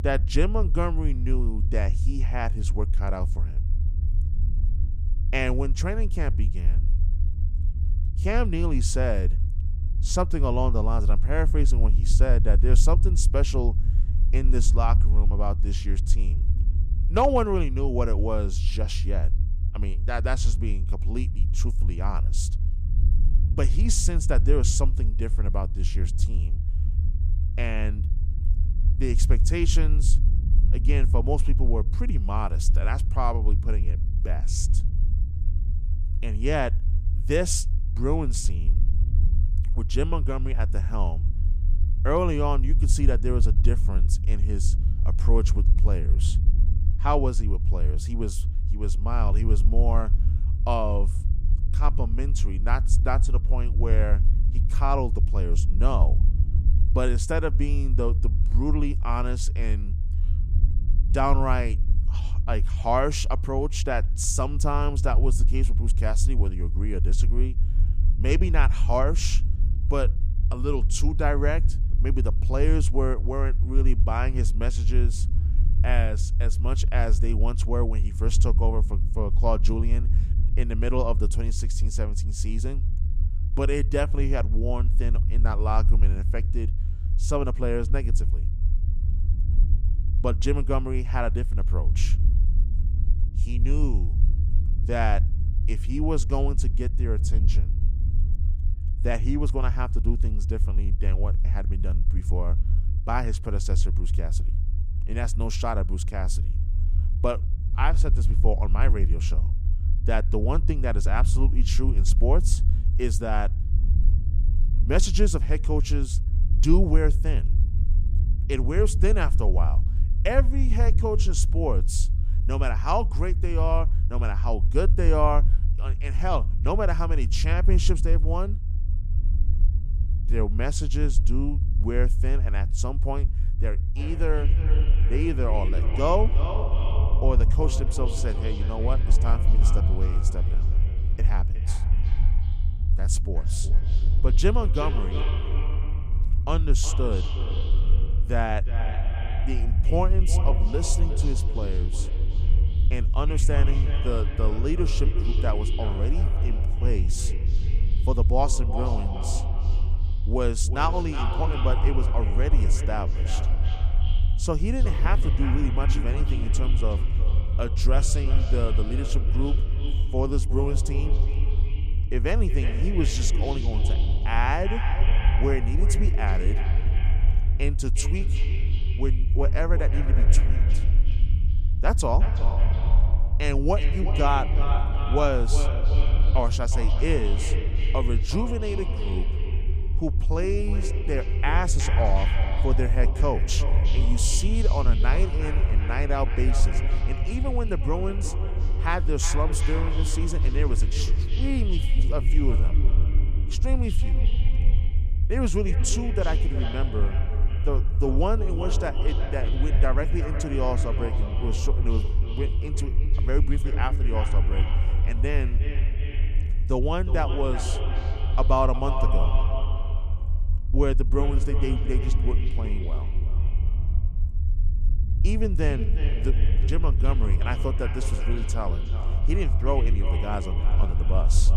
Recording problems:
echo of what is said; strong; from 2:14 on; 360 ms later, 8 dB below the speech
low rumble; noticeable; throughout; 15 dB below the speech

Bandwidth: 15 kHz